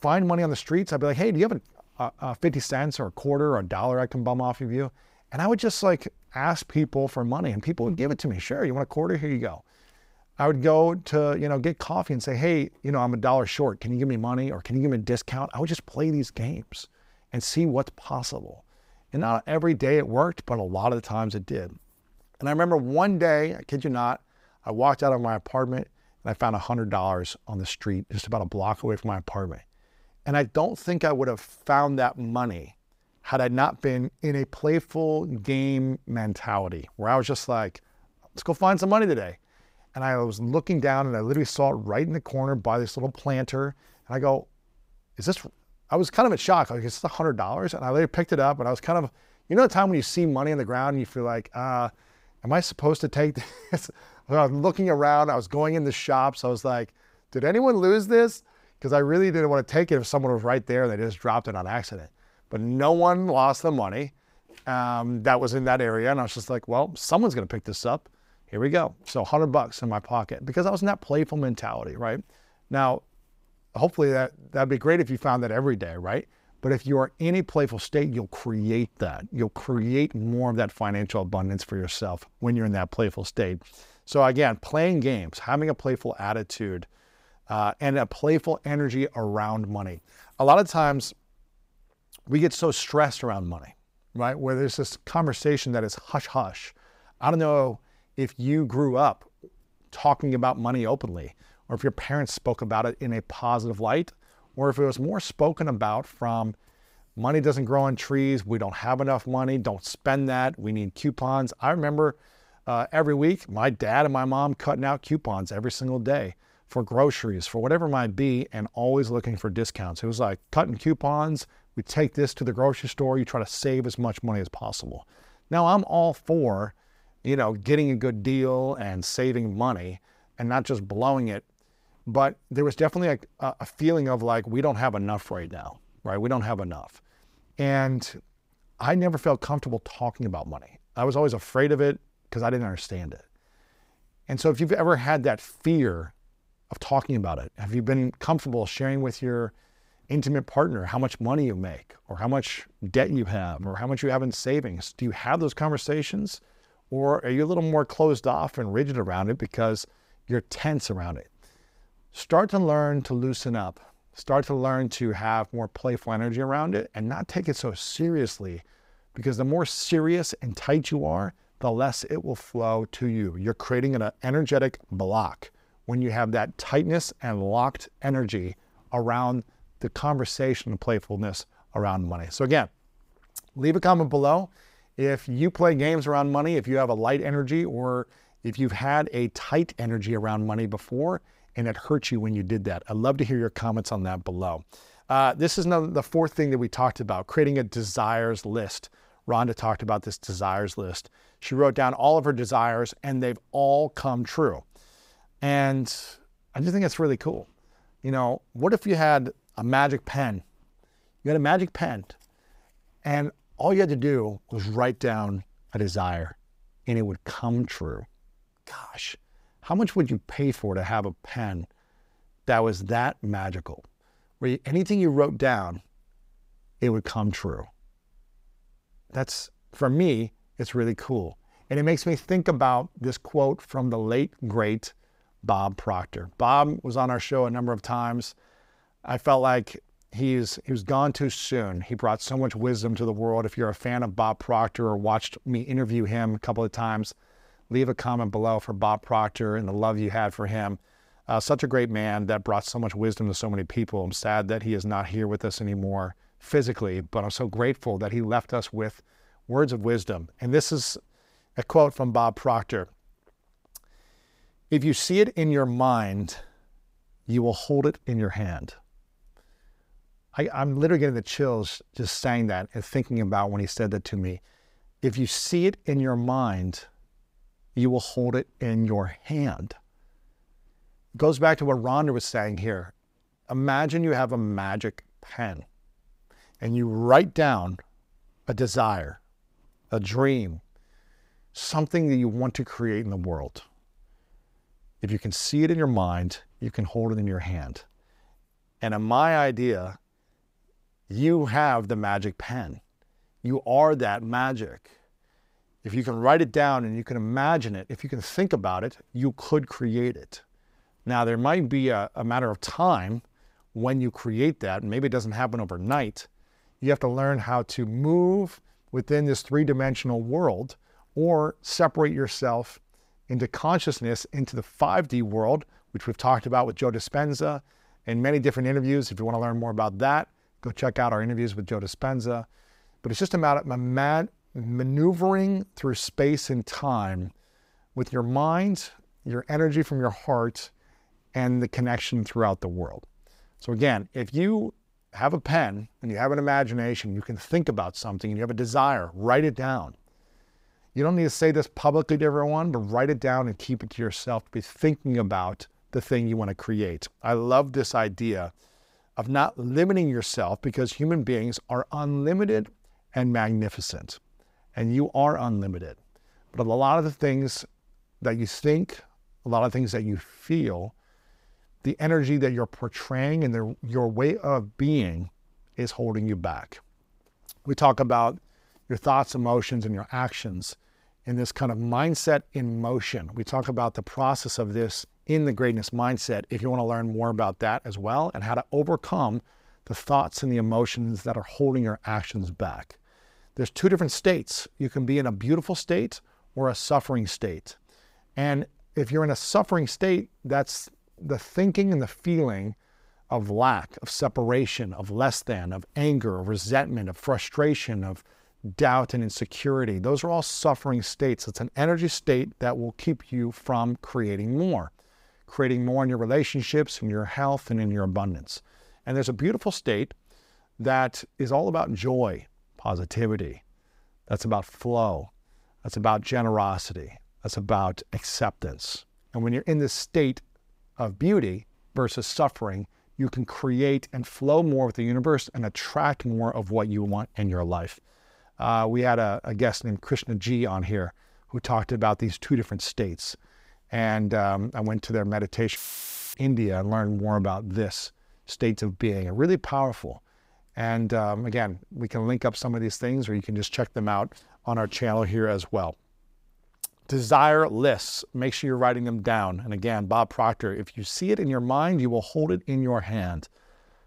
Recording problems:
audio cutting out; filled with static; at 7:26 for 0.5 s

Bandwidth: 15.5 kHz